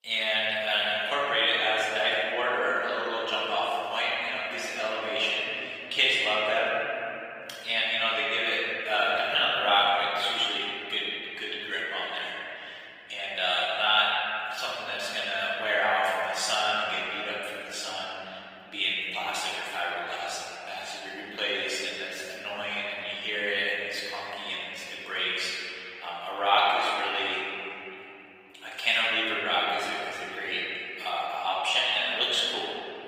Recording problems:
room echo; strong; dies away in 3 s
off-mic speech; far
thin; very; fading below 650 Hz
garbled, watery; slightly; nothing above 15.5 kHz

